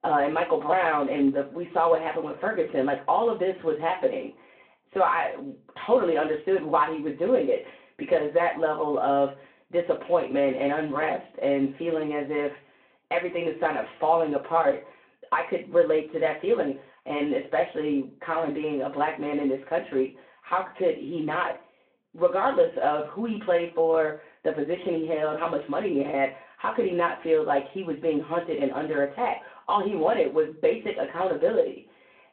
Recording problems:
off-mic speech; far
room echo; slight; dies away in 0.3 s
phone-call audio

